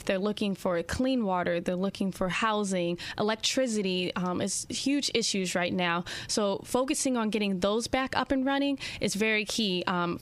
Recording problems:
squashed, flat; heavily

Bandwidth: 15 kHz